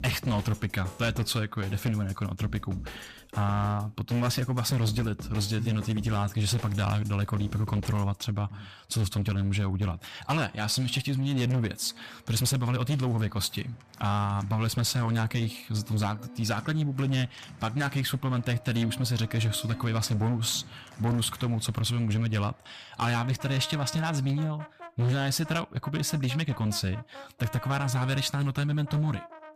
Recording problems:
distortion; slight; 11% of the sound clipped
background music; noticeable; throughout; 15 dB below the speech

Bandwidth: 14.5 kHz